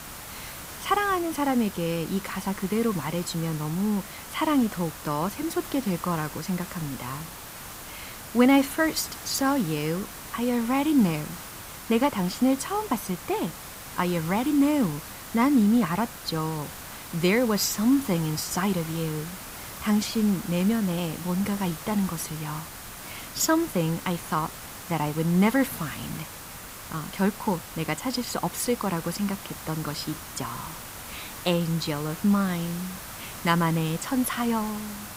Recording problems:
hiss; noticeable; throughout; 10 dB below the speech

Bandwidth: 15.5 kHz